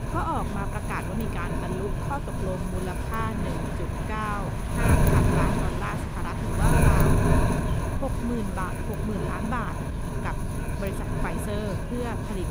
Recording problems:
wind noise on the microphone; heavy; 1 dB above the speech
murmuring crowd; loud; throughout; 10 dB below the speech

